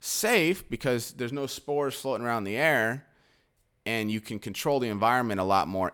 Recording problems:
none

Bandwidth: 19 kHz